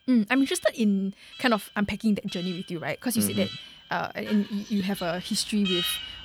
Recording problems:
alarms or sirens; loud; throughout; 8 dB below the speech

